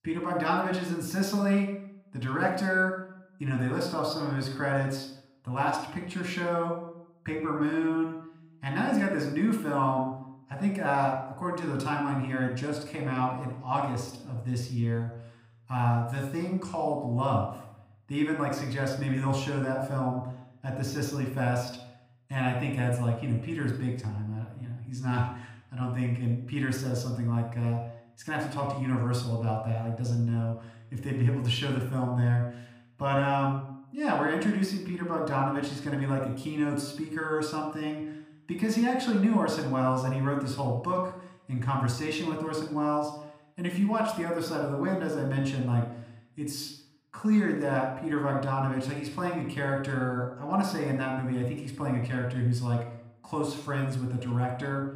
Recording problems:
room echo; noticeable; dies away in 0.6 s
off-mic speech; somewhat distant

